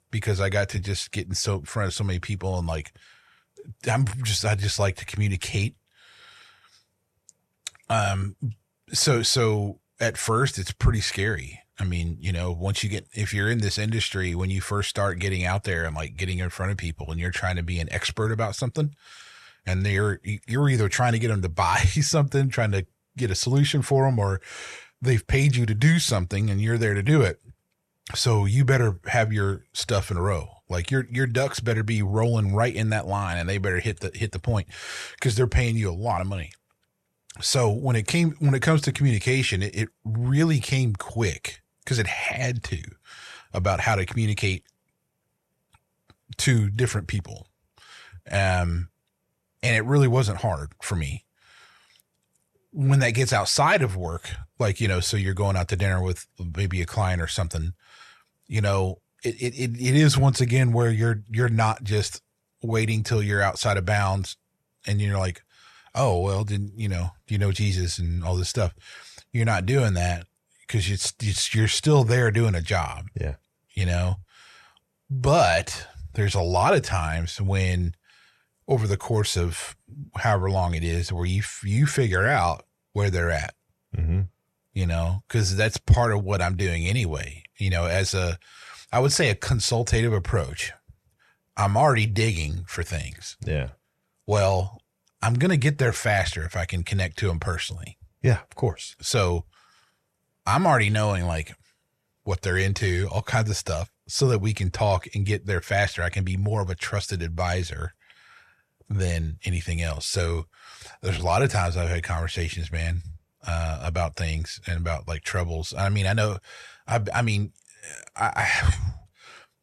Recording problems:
none

